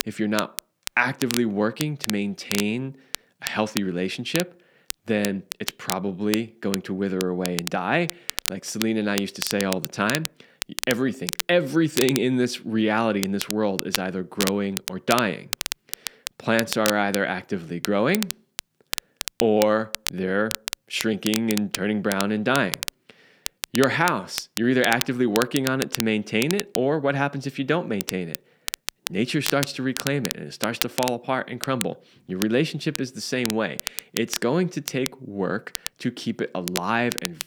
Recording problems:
crackle, like an old record; loud; 6 dB below the speech

